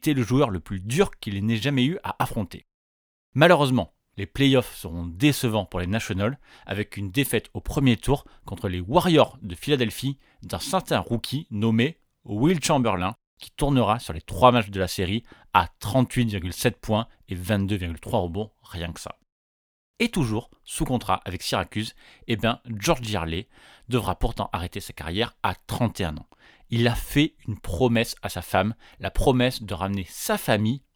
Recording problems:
none

